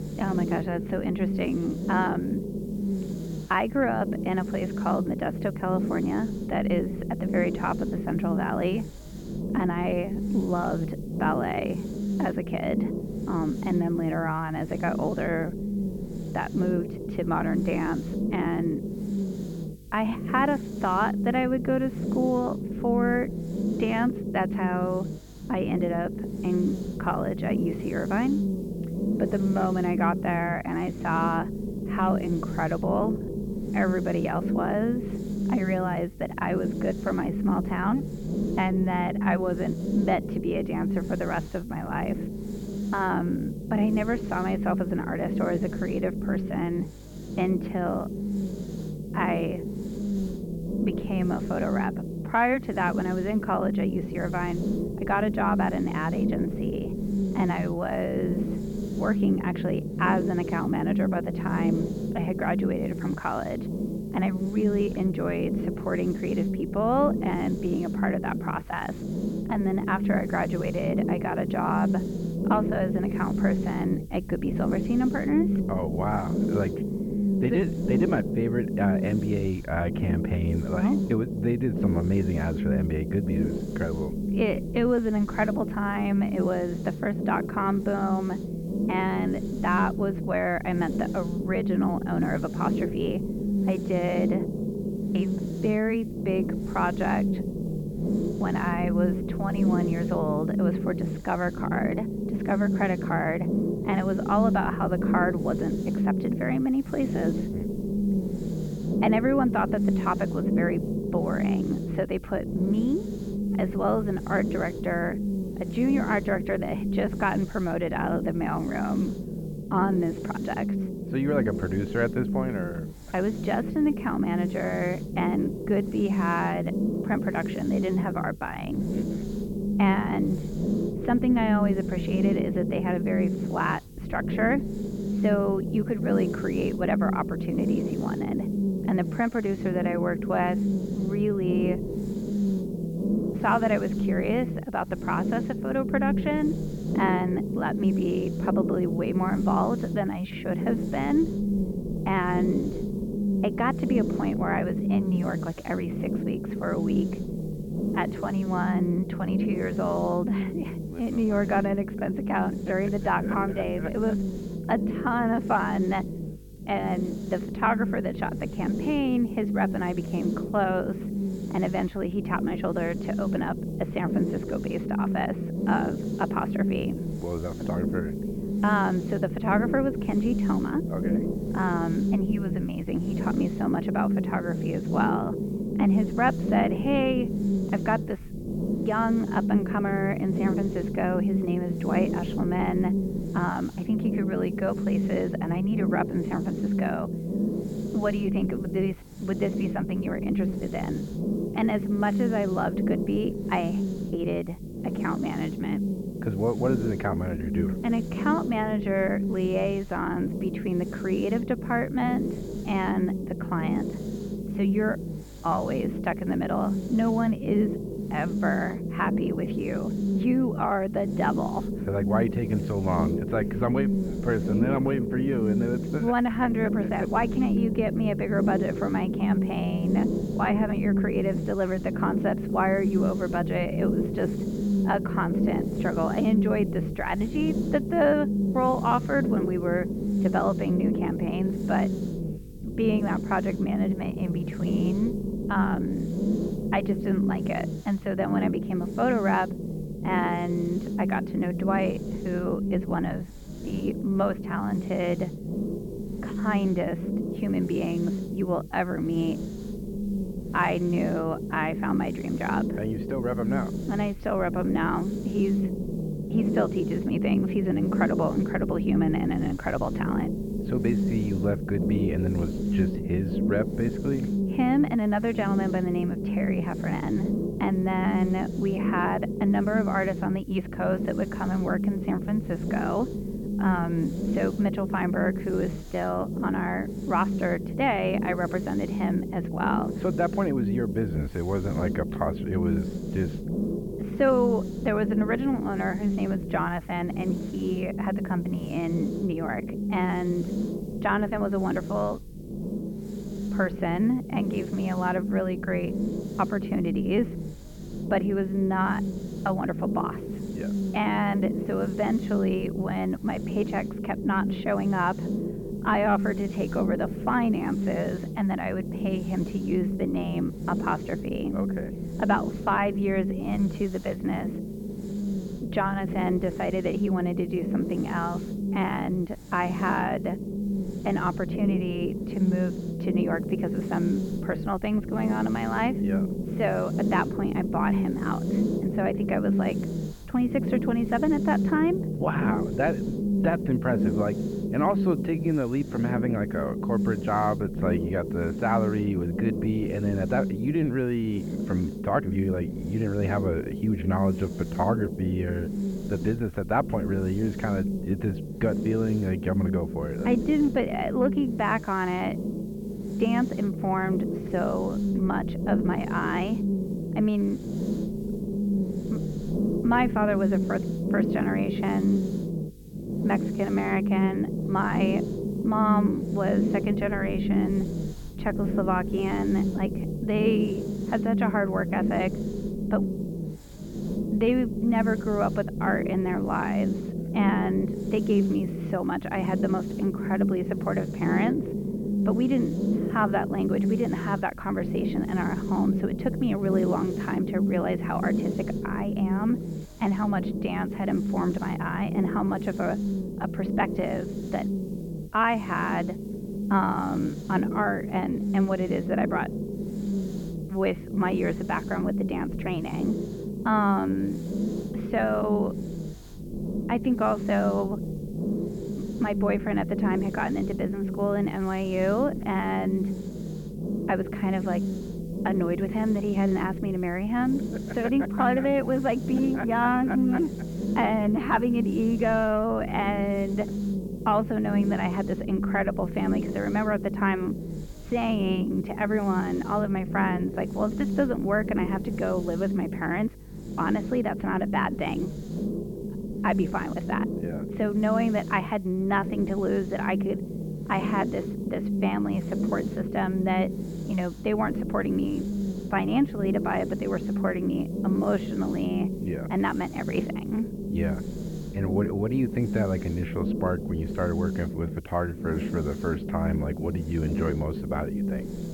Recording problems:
muffled; very; fading above 2.5 kHz
low rumble; loud; throughout; 7 dB below the speech
electrical hum; faint; throughout; 50 Hz, 25 dB below the speech
hiss; faint; throughout; 25 dB below the speech

